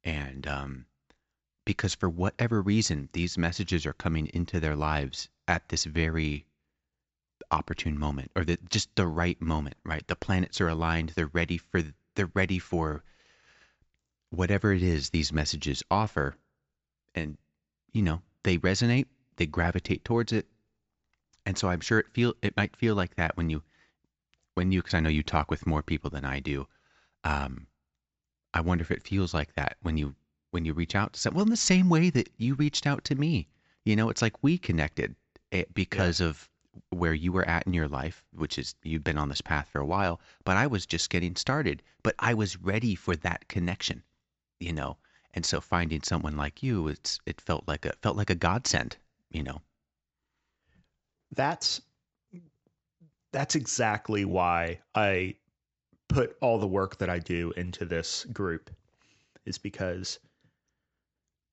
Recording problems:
high frequencies cut off; noticeable; nothing above 7.5 kHz

